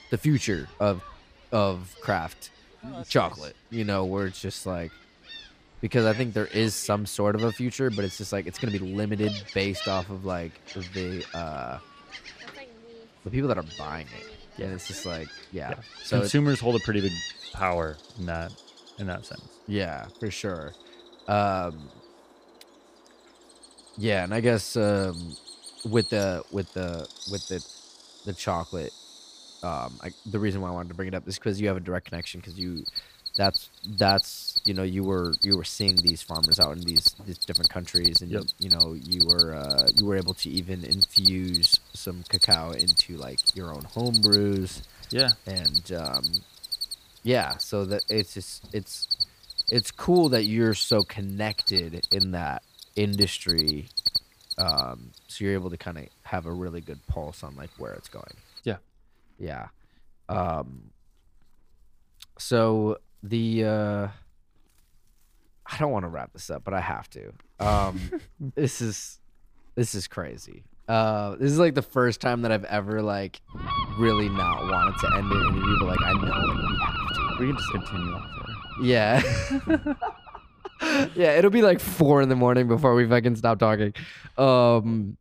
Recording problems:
animal sounds; very loud; throughout; 3 dB above the speech

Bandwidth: 15 kHz